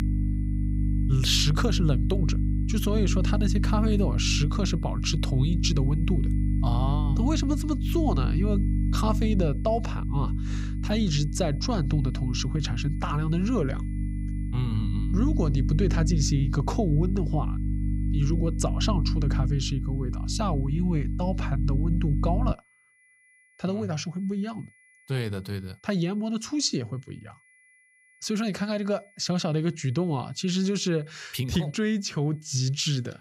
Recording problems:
electrical hum; loud; until 23 s; 50 Hz, 8 dB below the speech
high-pitched whine; faint; throughout; 2 kHz, 30 dB below the speech

